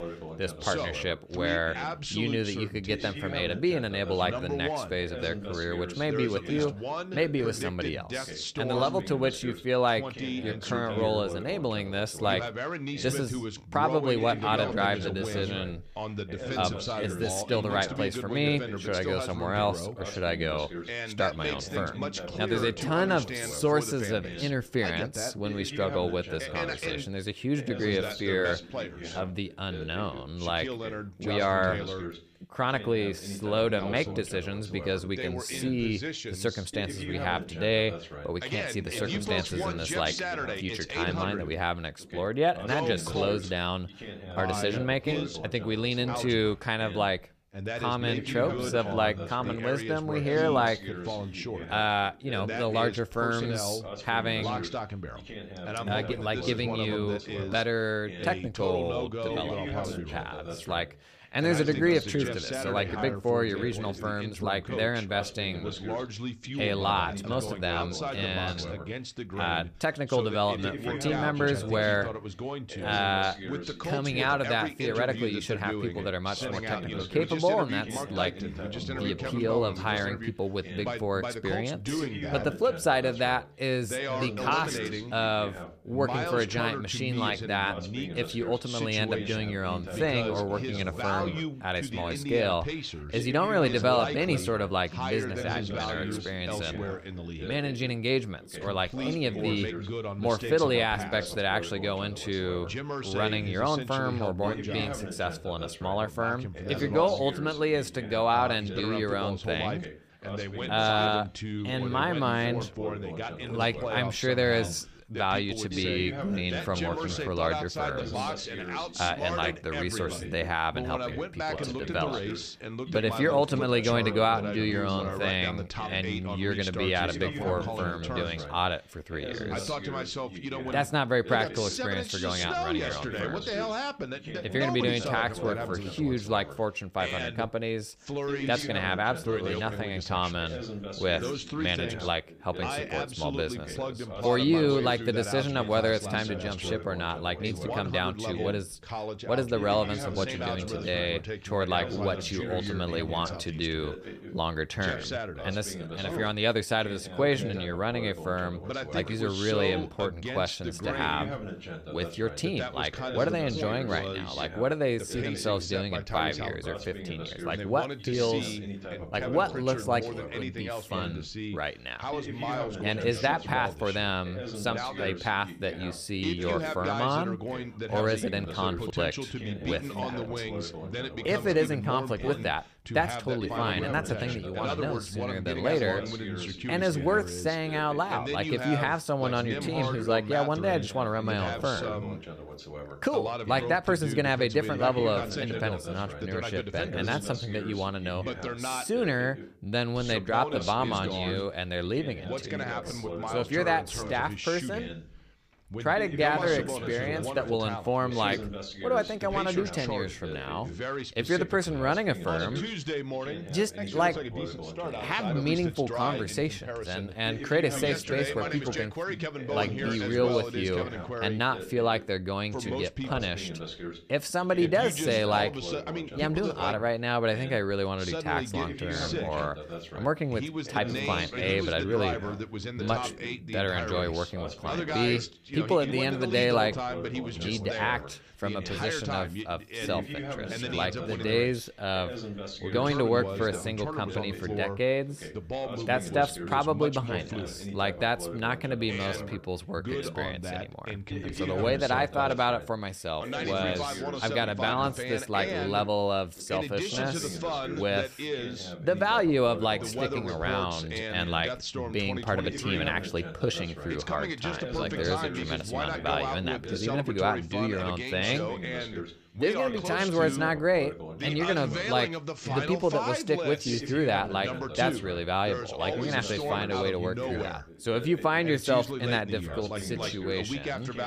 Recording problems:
background chatter; loud; throughout; 2 voices, 6 dB below the speech

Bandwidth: 15 kHz